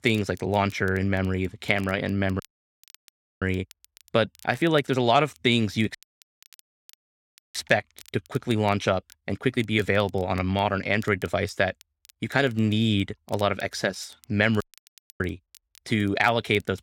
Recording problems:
crackle, like an old record; faint; 30 dB below the speech
audio cutting out; at 2.5 s for 1 s, at 6 s for 1.5 s and at 15 s for 0.5 s

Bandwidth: 16.5 kHz